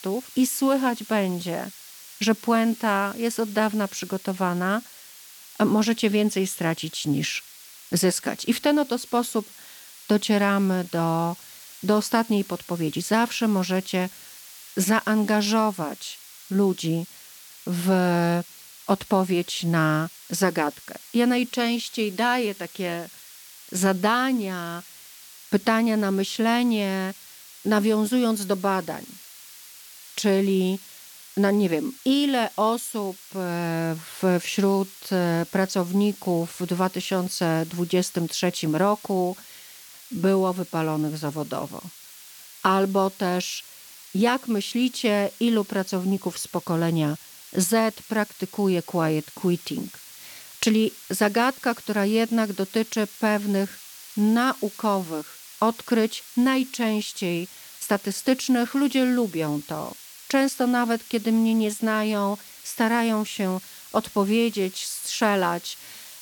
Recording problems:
hiss; noticeable; throughout; 20 dB below the speech

